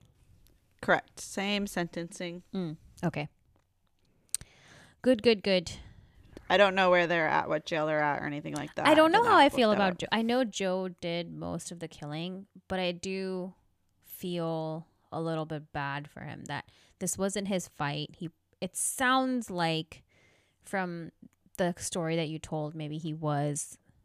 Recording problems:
none

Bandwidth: 14.5 kHz